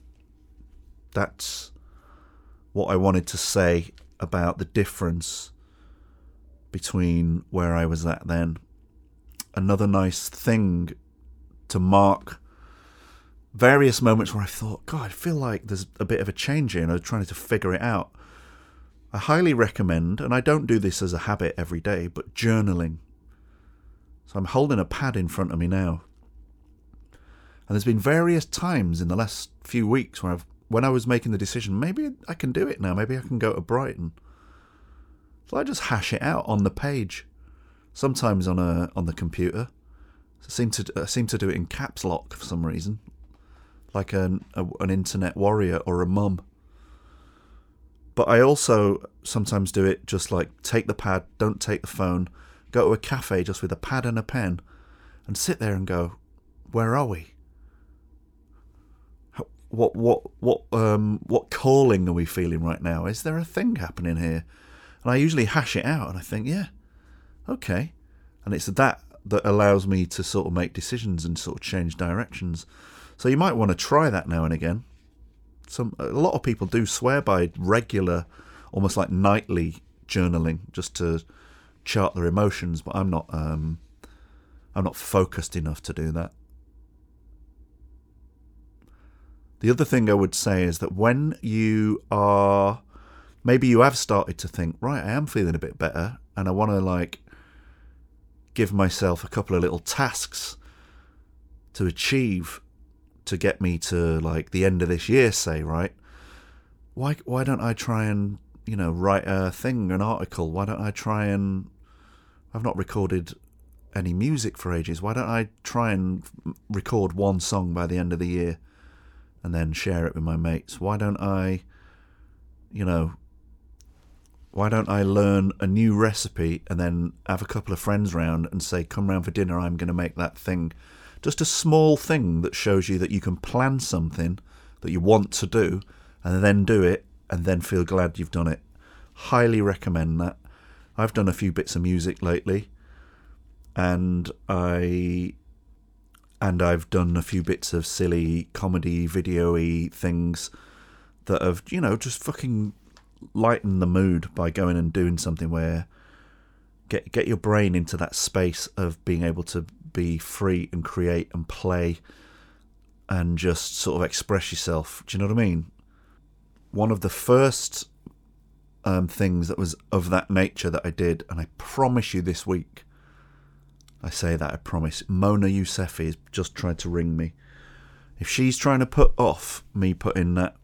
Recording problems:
none

